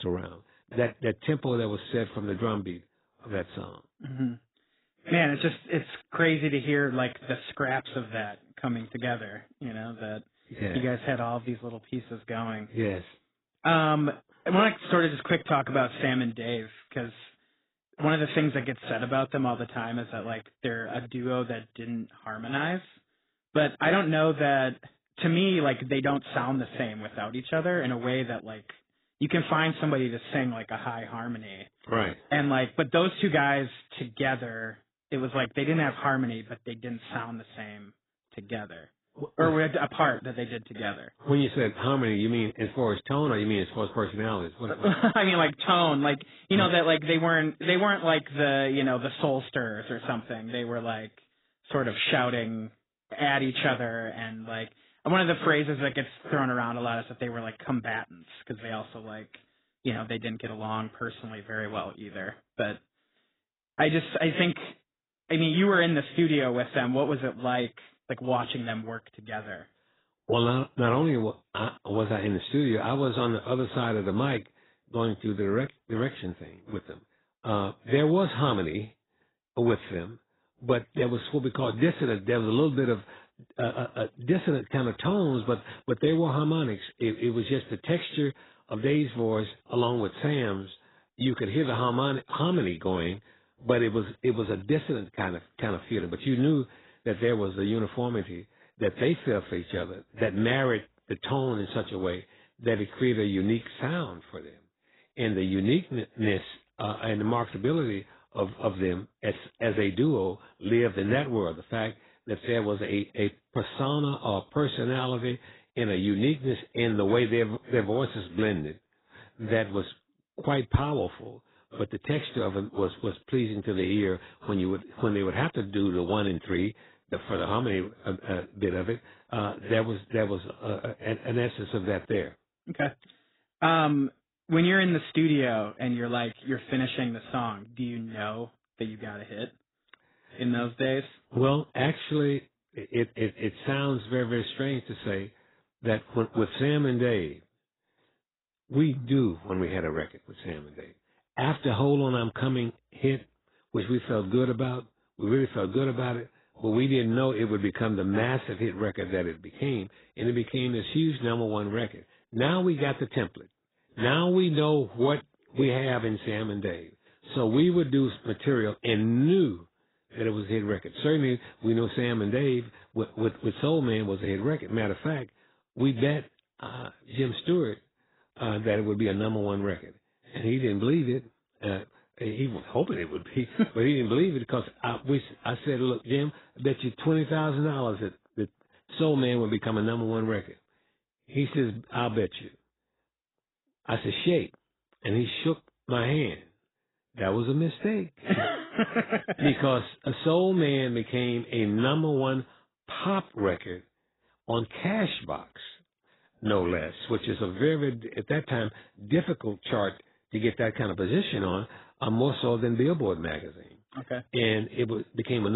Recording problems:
garbled, watery; badly; nothing above 4 kHz
abrupt cut into speech; at the start and the end

